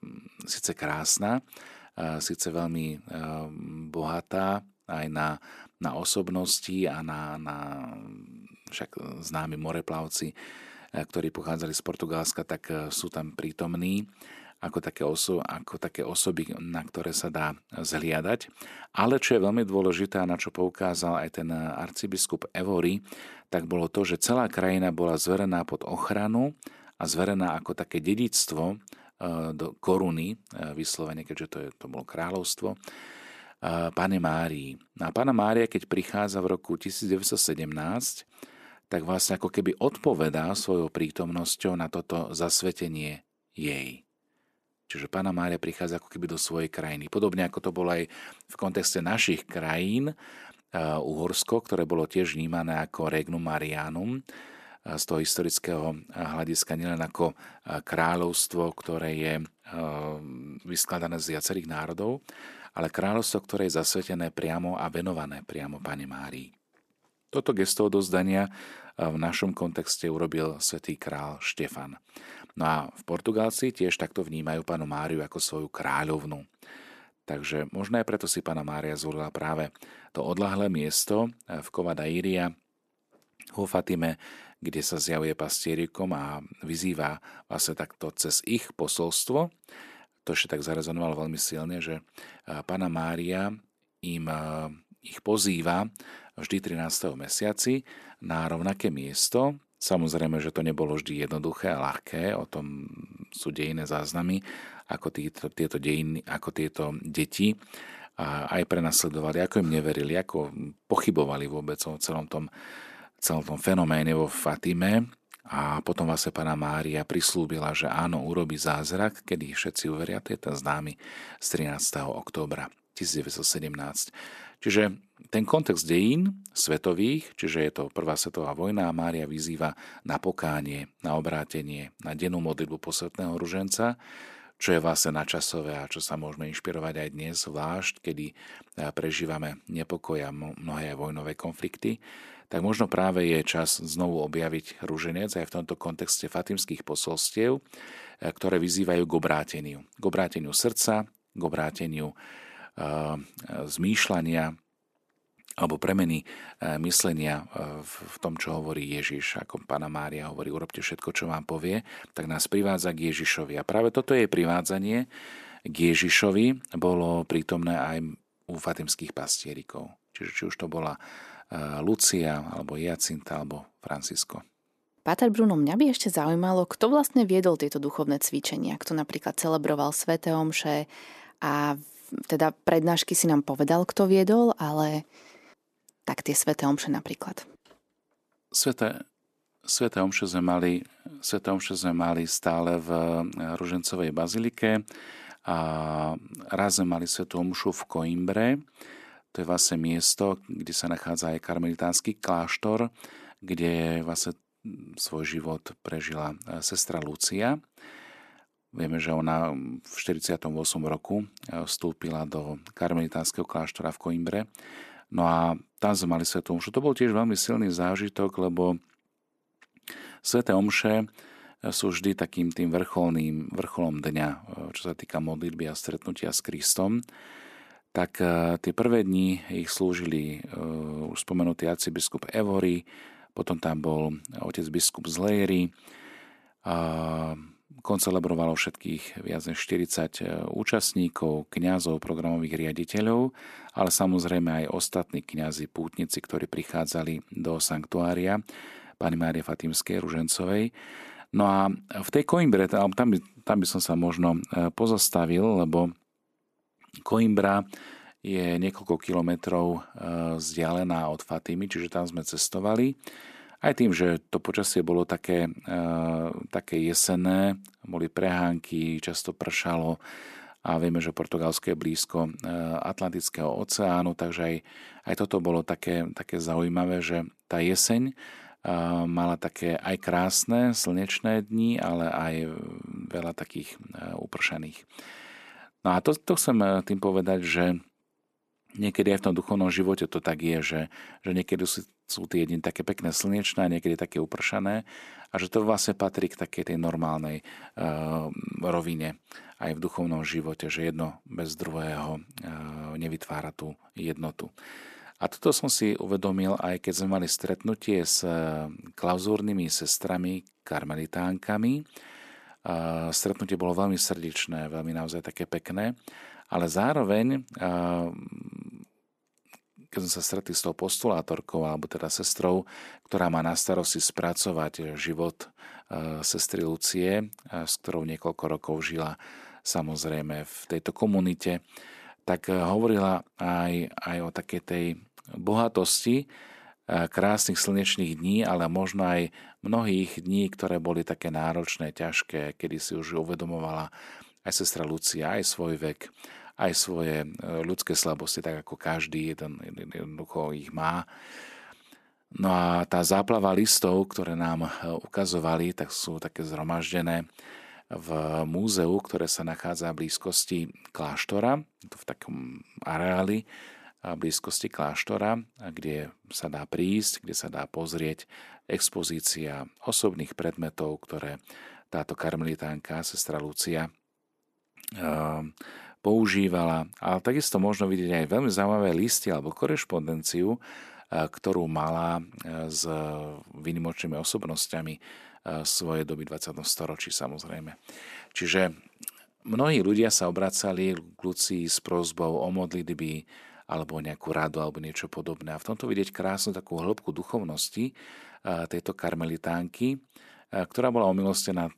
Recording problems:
none

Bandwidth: 14 kHz